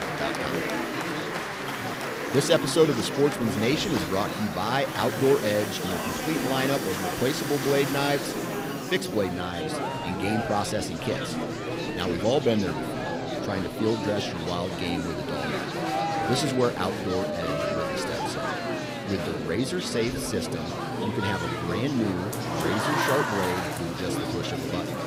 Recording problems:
murmuring crowd; loud; throughout; 2 dB below the speech
machinery noise; noticeable; throughout; 15 dB below the speech

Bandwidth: 15.5 kHz